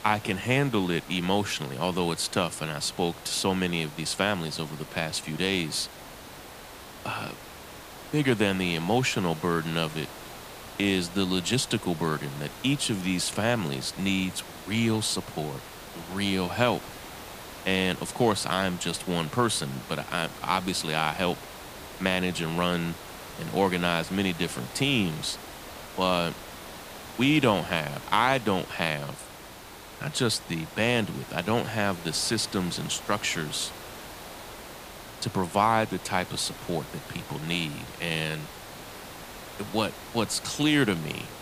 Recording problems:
hiss; noticeable; throughout; 15 dB below the speech

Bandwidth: 15 kHz